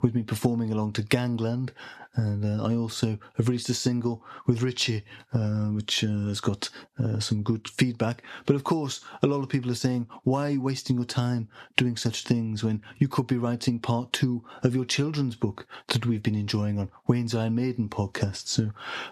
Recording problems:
squashed, flat; somewhat

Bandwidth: 13.5 kHz